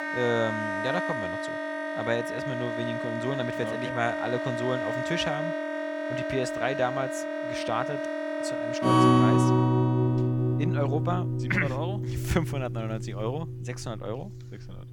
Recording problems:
background music; very loud; throughout; 4 dB above the speech

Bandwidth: 17.5 kHz